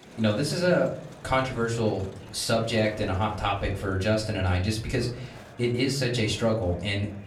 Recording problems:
off-mic speech; far
room echo; very slight; dies away in 0.5 s
murmuring crowd; noticeable; throughout; 20 dB below the speech

